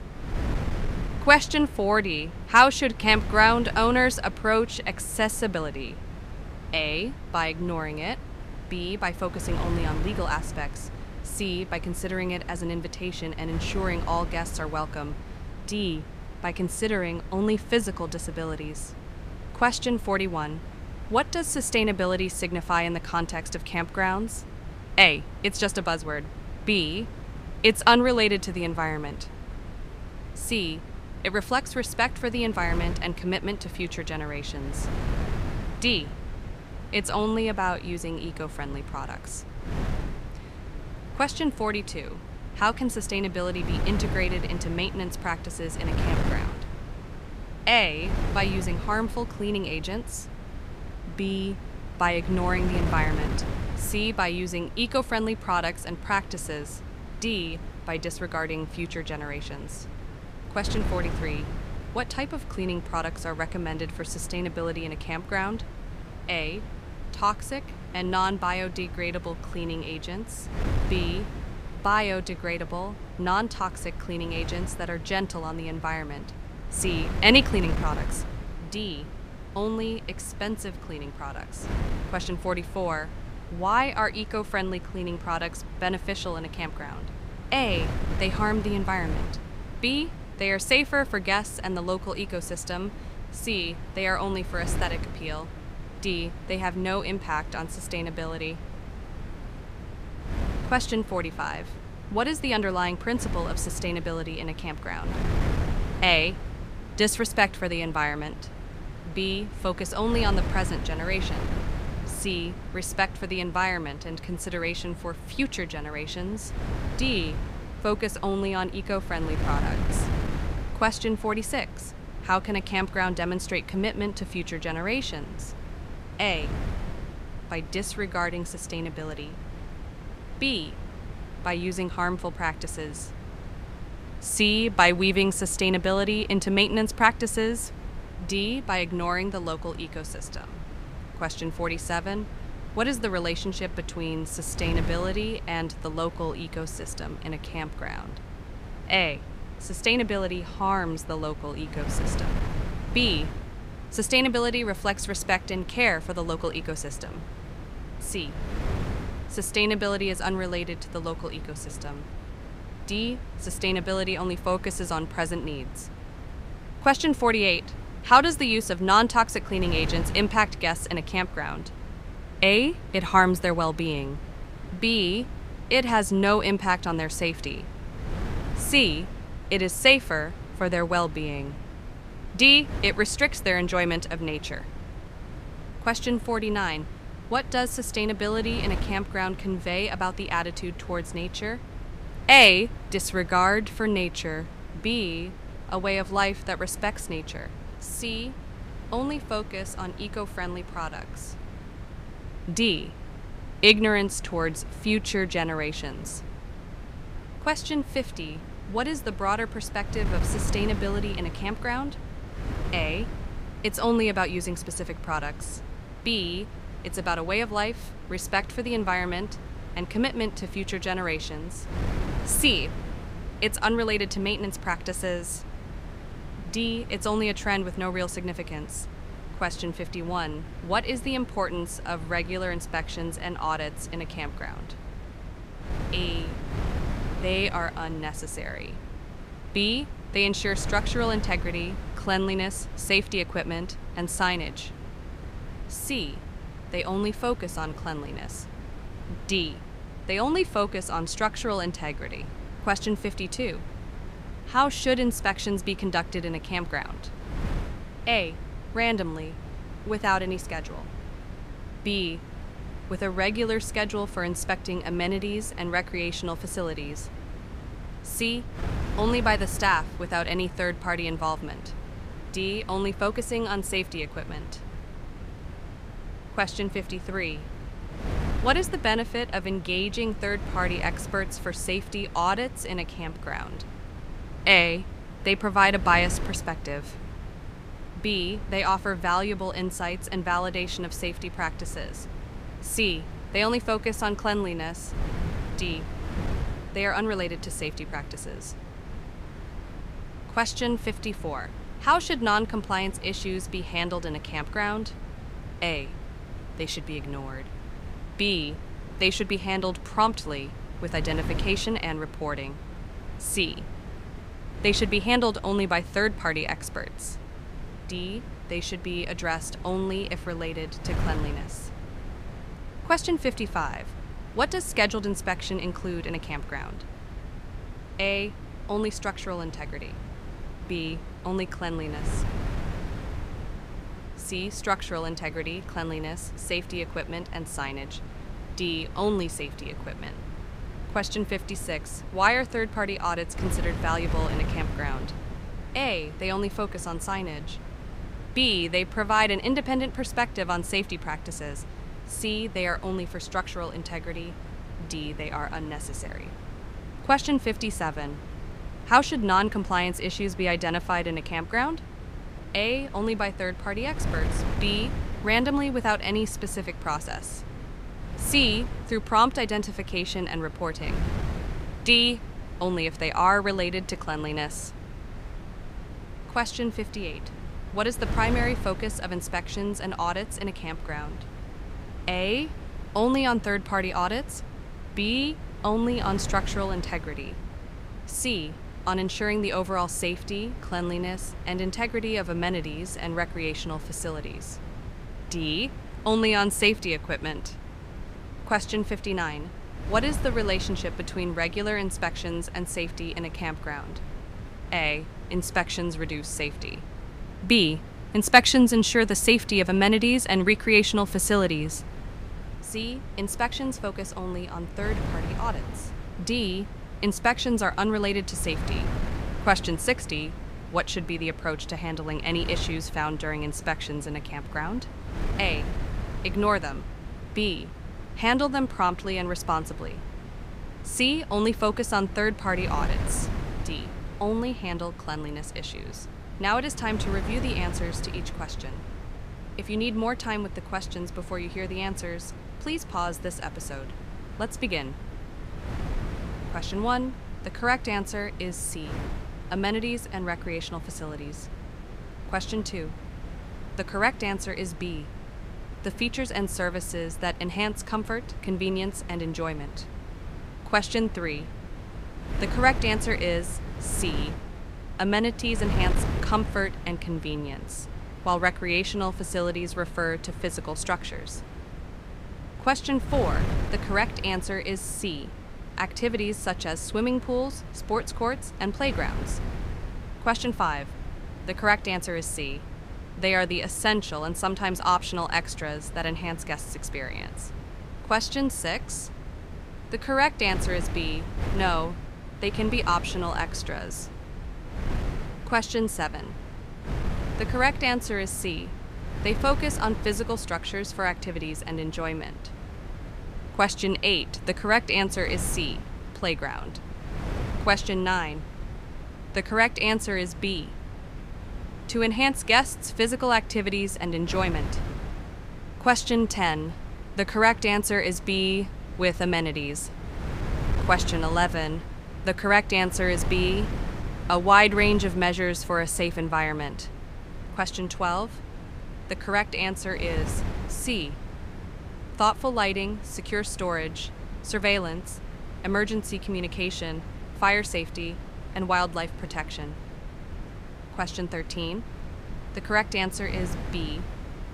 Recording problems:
wind noise on the microphone; occasional gusts; 15 dB below the speech

